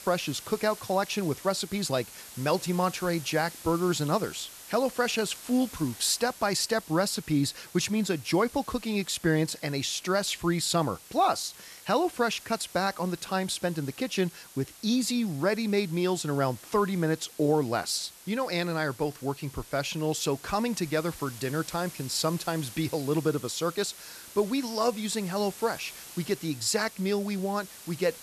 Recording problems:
hiss; noticeable; throughout; 15 dB below the speech

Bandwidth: 13.5 kHz